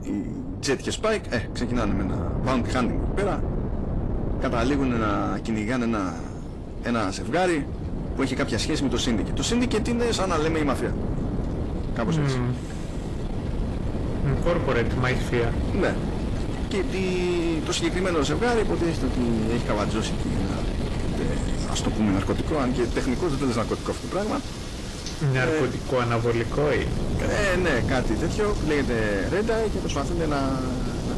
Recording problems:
distortion; slight; 10 dB below the speech
garbled, watery; slightly; nothing above 11.5 kHz
wind noise on the microphone; heavy; 9 dB below the speech
rain or running water; noticeable; throughout; 15 dB below the speech

